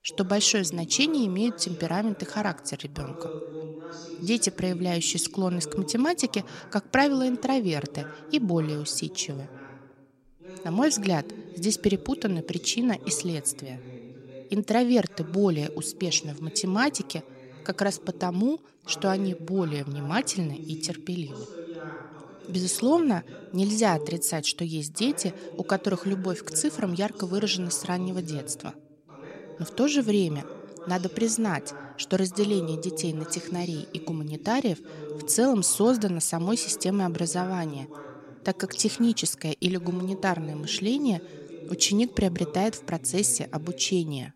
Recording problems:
voice in the background; noticeable; throughout; 15 dB below the speech

